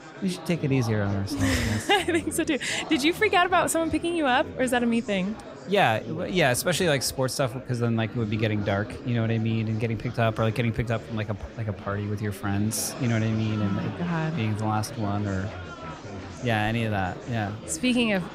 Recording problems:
murmuring crowd; noticeable; throughout; 15 dB below the speech

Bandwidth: 15.5 kHz